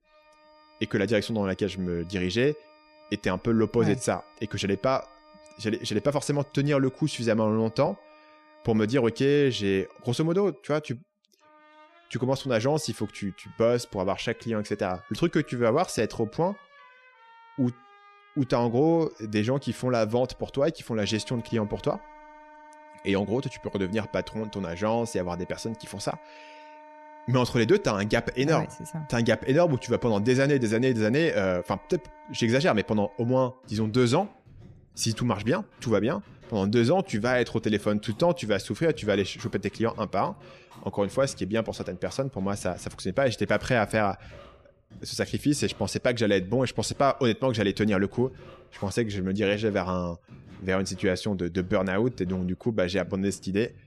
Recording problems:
background music; faint; throughout; 25 dB below the speech

